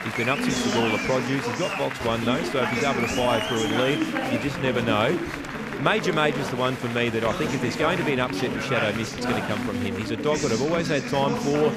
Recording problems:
chatter from many people; loud; throughout; 2 dB below the speech

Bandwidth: 14.5 kHz